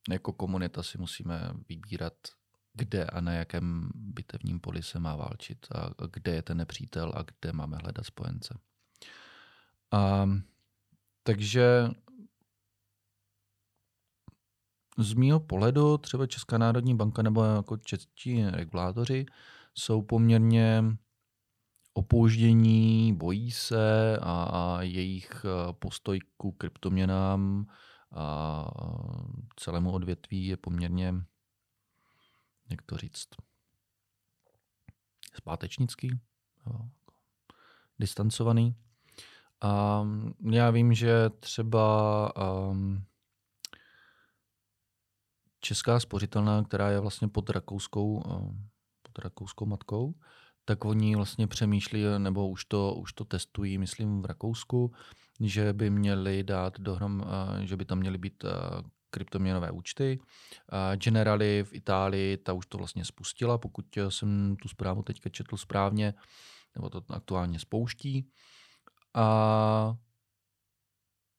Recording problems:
none

